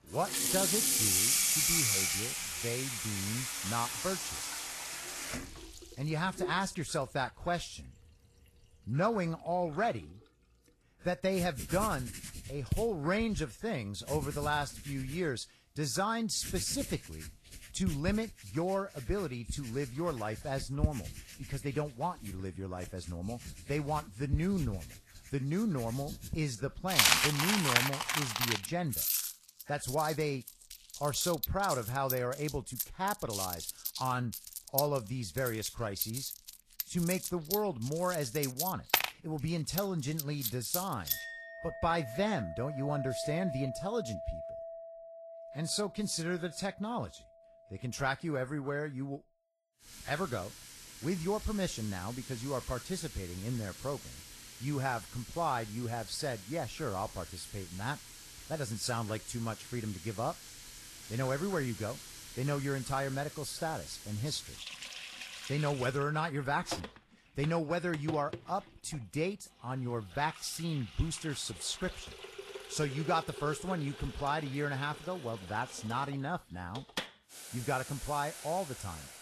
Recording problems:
garbled, watery; slightly; nothing above 12.5 kHz
household noises; loud; throughout; as loud as the speech

